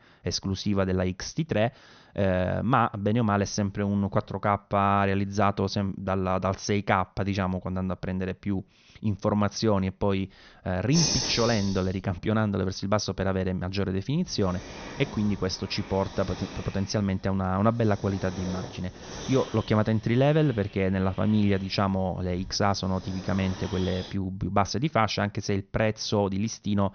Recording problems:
high frequencies cut off; noticeable; nothing above 6.5 kHz
hiss; loud; from 11 to 24 s; 8 dB below the speech

